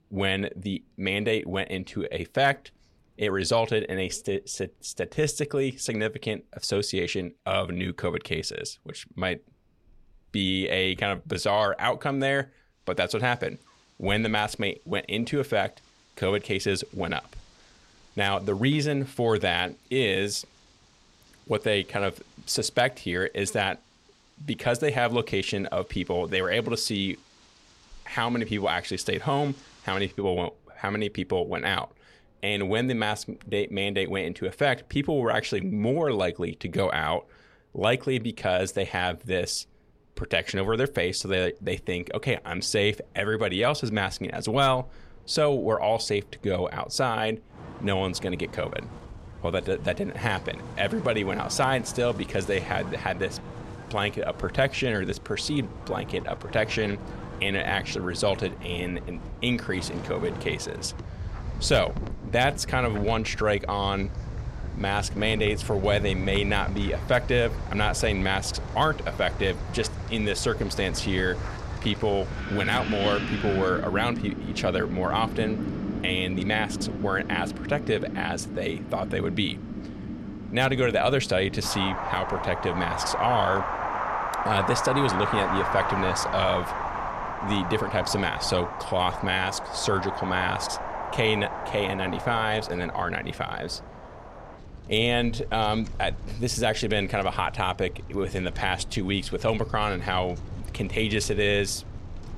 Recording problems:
wind in the background; loud; throughout; 7 dB below the speech

